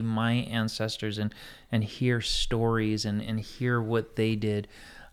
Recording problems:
abrupt cut into speech; at the start

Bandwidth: 19 kHz